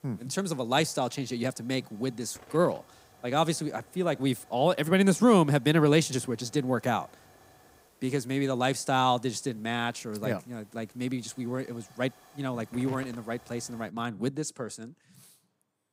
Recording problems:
hiss; faint; until 14 s; 25 dB below the speech

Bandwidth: 15.5 kHz